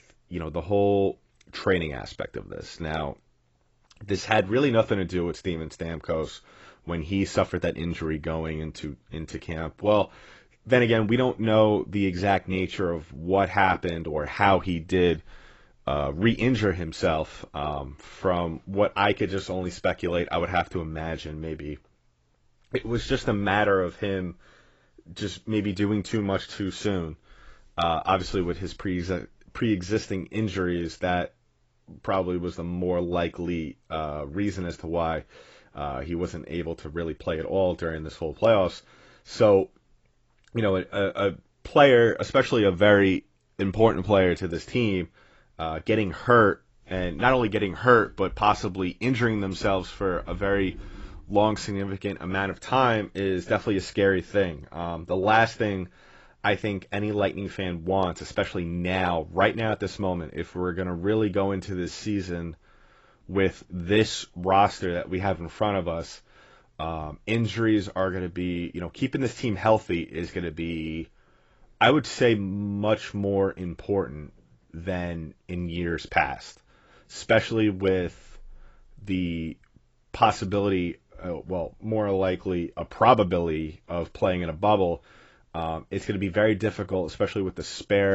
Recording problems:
garbled, watery; badly; nothing above 7.5 kHz
abrupt cut into speech; at the end

